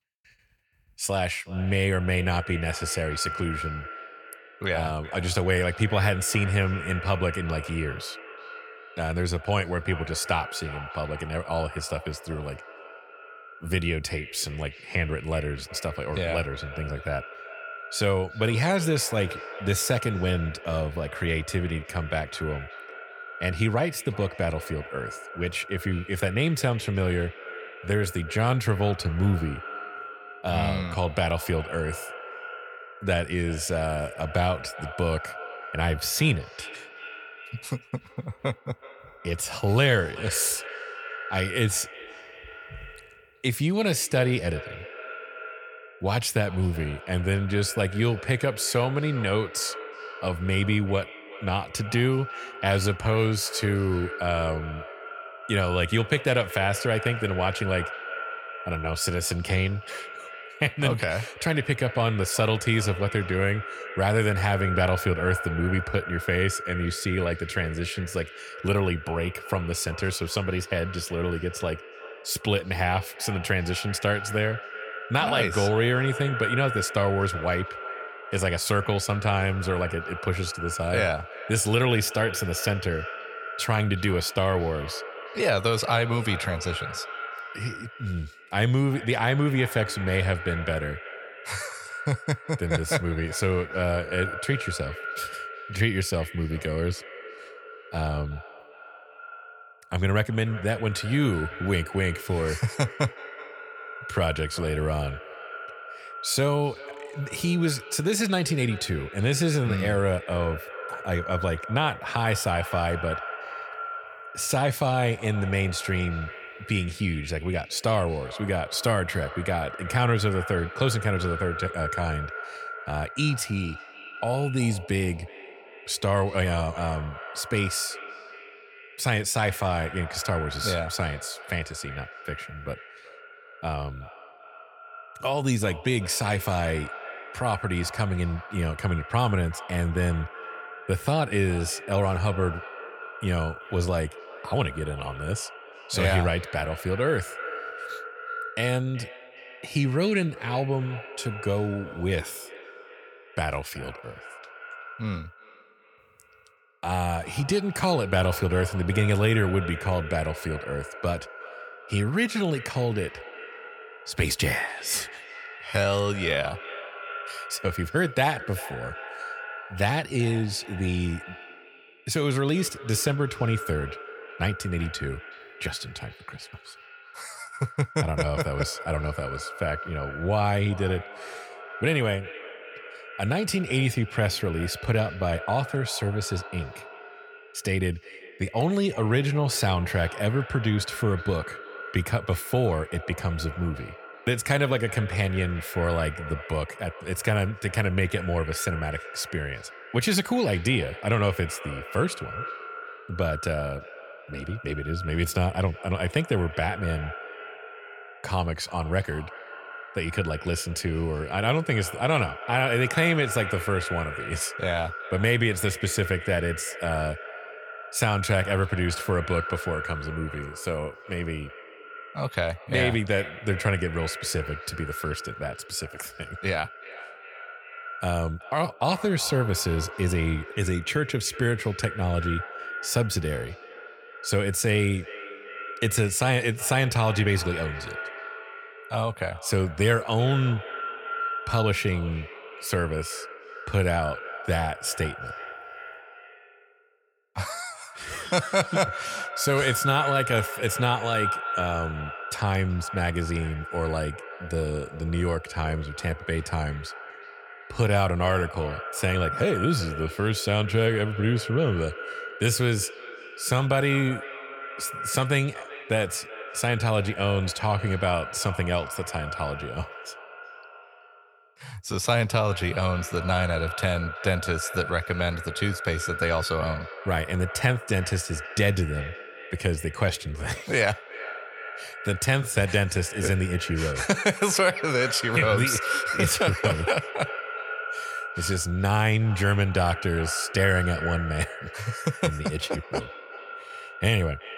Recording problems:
echo of what is said; strong; throughout; 370 ms later, 10 dB below the speech

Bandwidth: 18 kHz